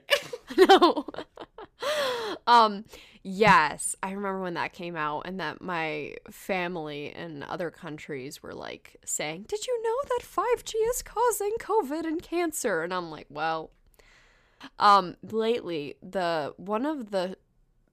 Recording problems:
none

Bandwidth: 14.5 kHz